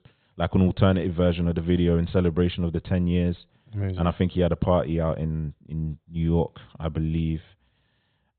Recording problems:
high frequencies cut off; severe; nothing above 4 kHz

